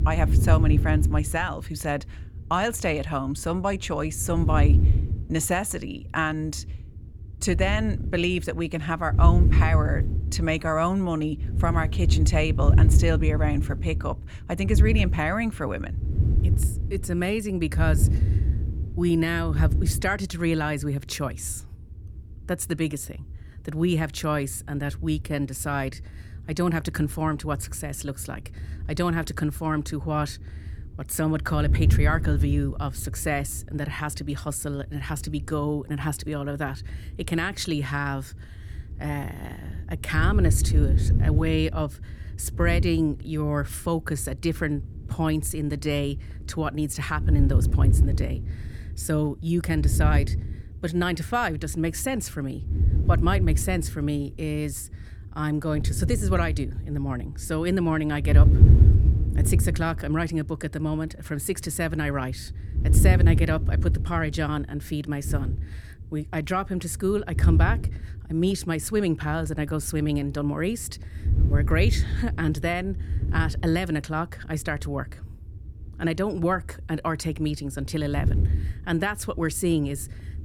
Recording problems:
wind noise on the microphone; occasional gusts; 10 dB below the speech

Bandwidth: 18.5 kHz